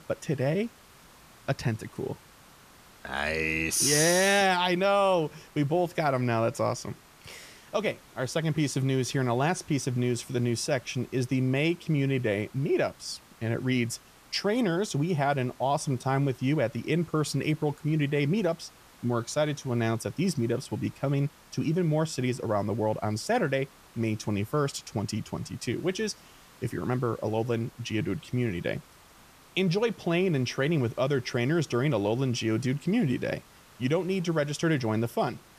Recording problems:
hiss; faint; throughout; 25 dB below the speech

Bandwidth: 14.5 kHz